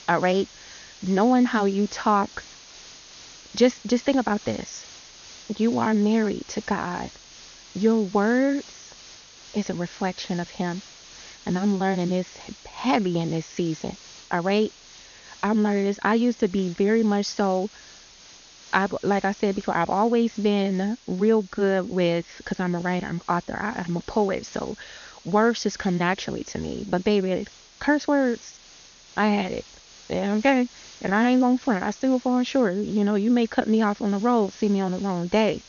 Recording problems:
high frequencies cut off; noticeable; nothing above 6.5 kHz
hiss; faint; throughout; 20 dB below the speech

